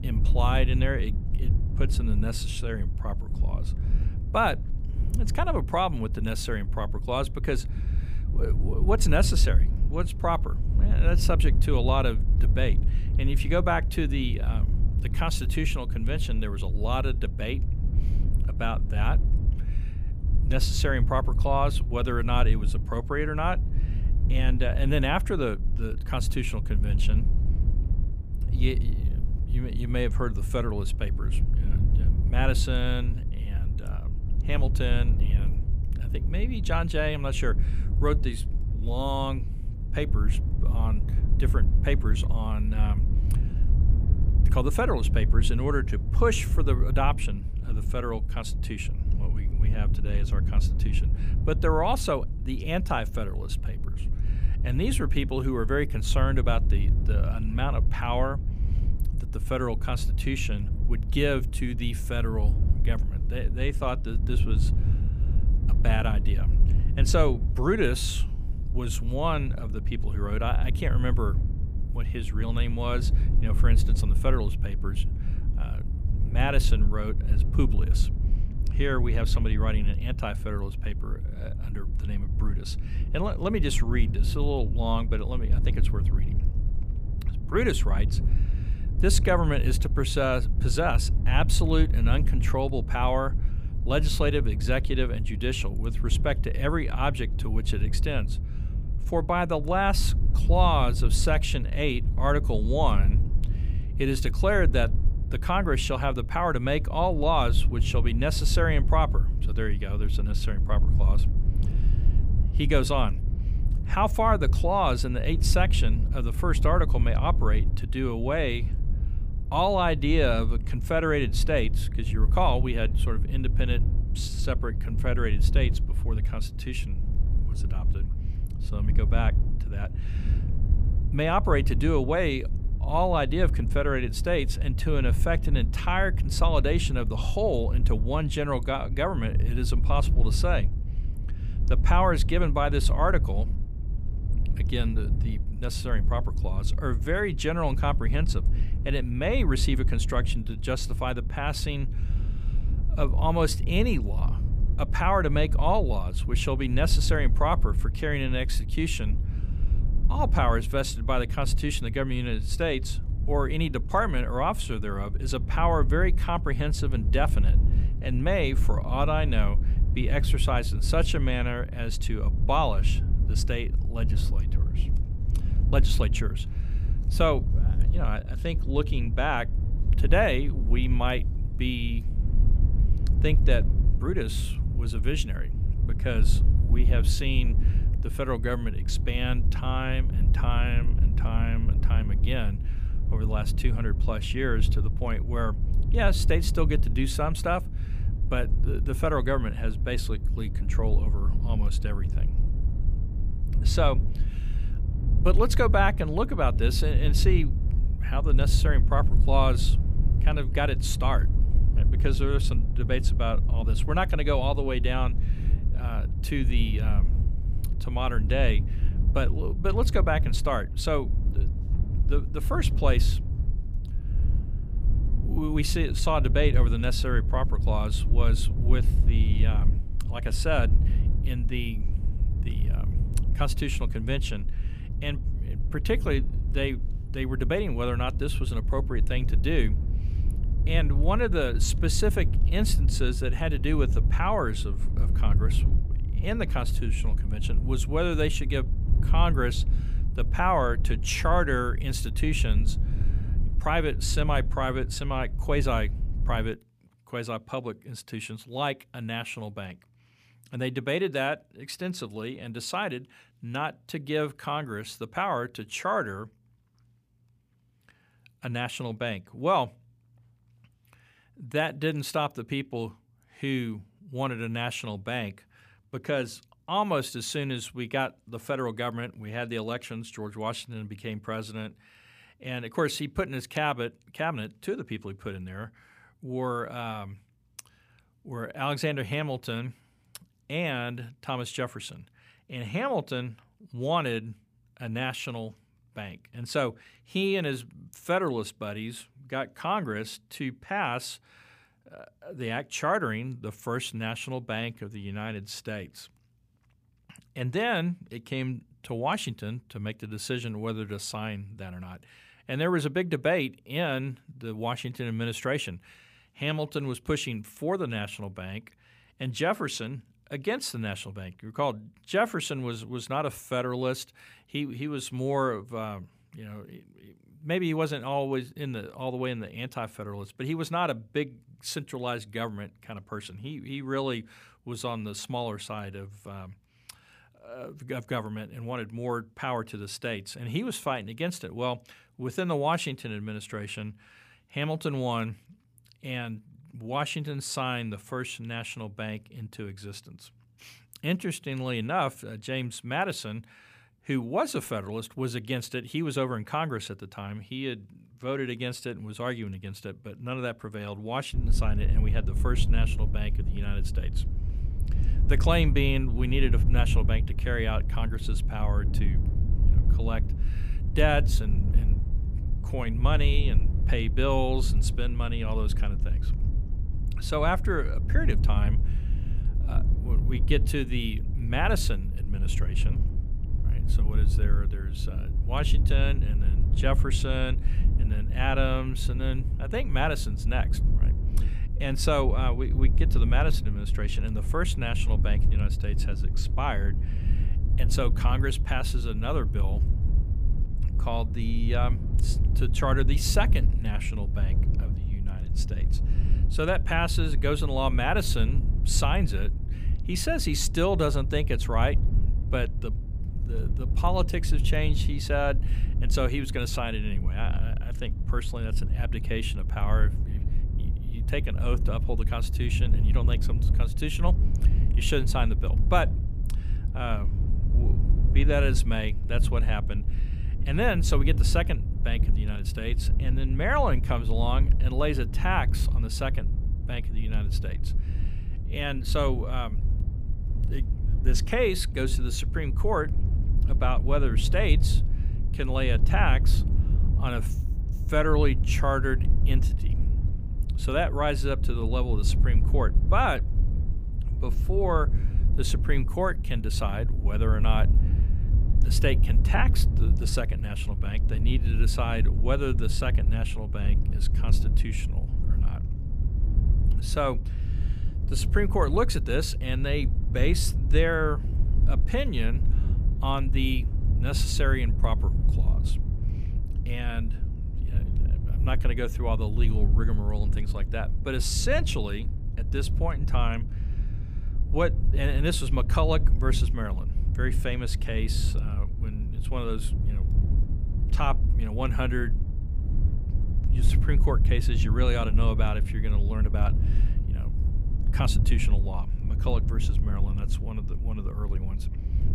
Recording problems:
wind noise on the microphone; occasional gusts; until 4:16 and from 6:01 on; 15 dB below the speech

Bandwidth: 15 kHz